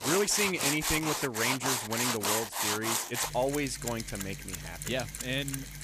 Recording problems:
machinery noise; very loud; throughout; as loud as the speech

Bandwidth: 14.5 kHz